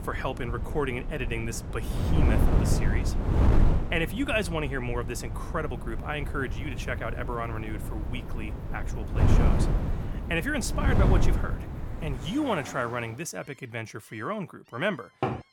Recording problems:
wind noise on the microphone; heavy; until 12 s; 5 dB below the speech
animal sounds; noticeable; from 5.5 s on; 15 dB below the speech
door banging; loud; at 15 s; peak 1 dB above the speech

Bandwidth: 17.5 kHz